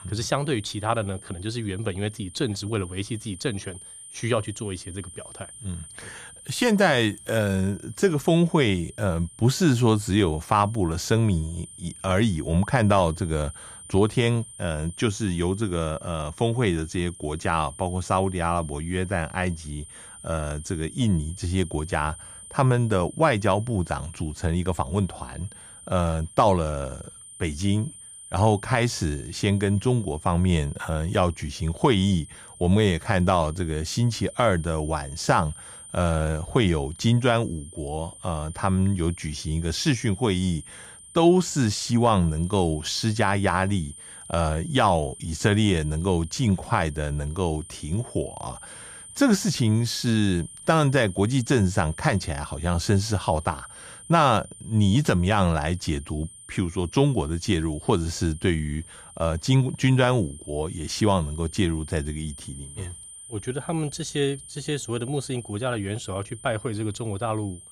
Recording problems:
high-pitched whine; noticeable; throughout; 9 kHz, 15 dB below the speech

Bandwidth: 14.5 kHz